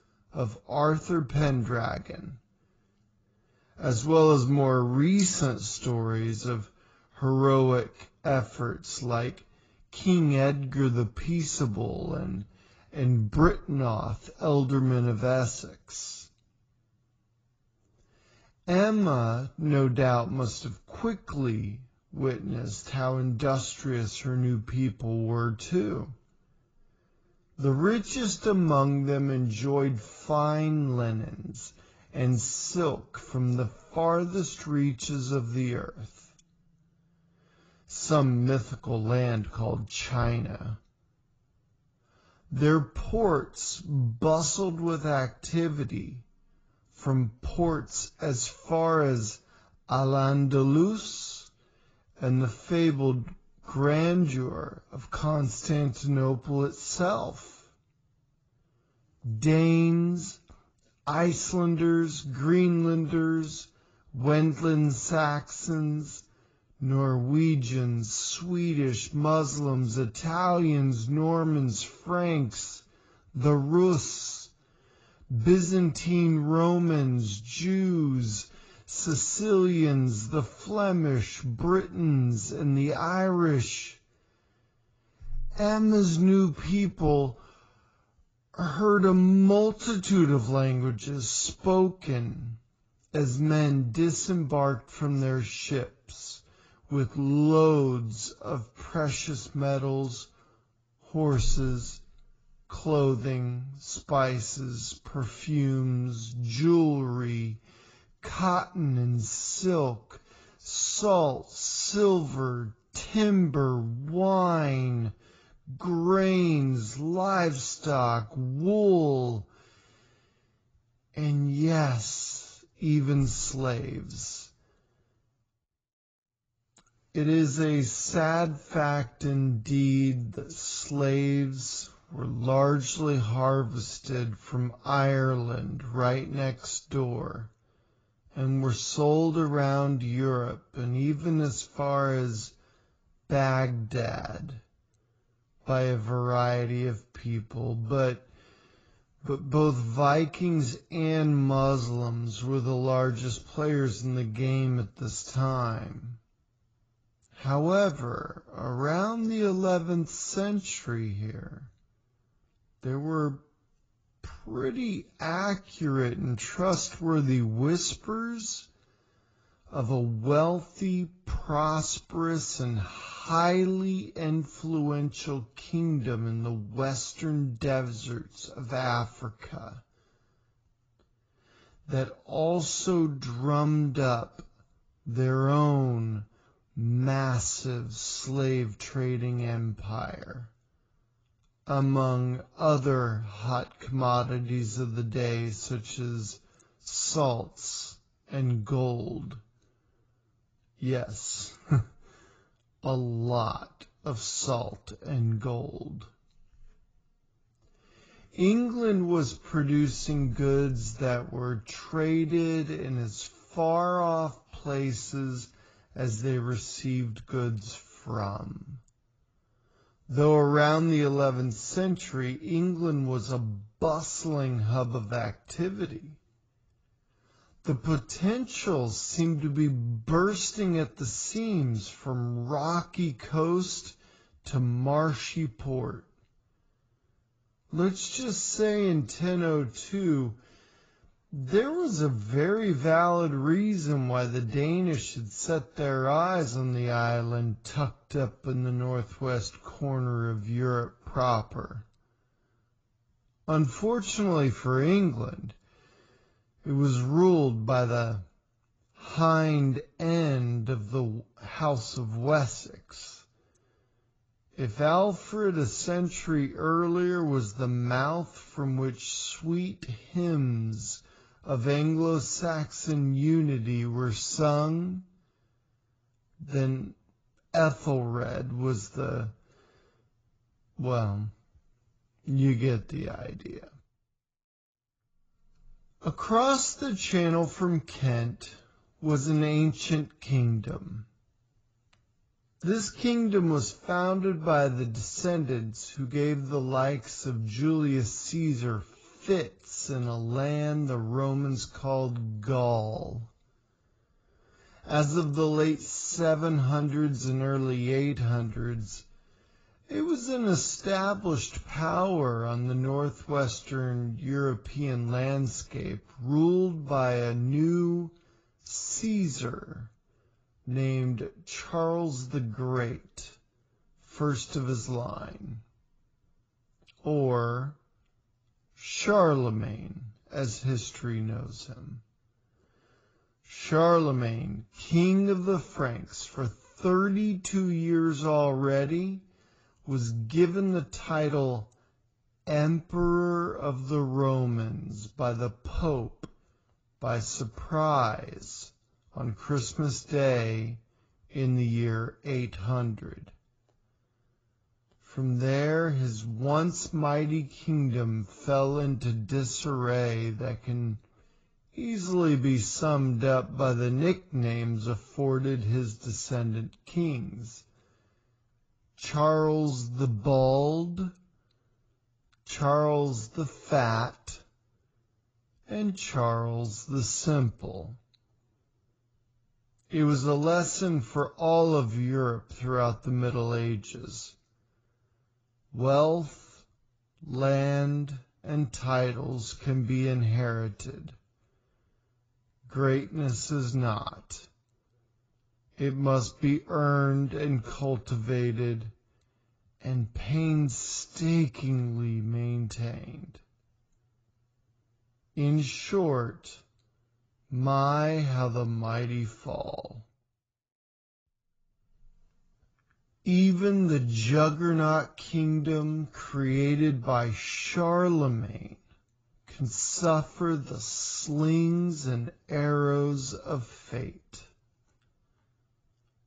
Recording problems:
garbled, watery; badly; nothing above 7.5 kHz
wrong speed, natural pitch; too slow; 0.6 times normal speed

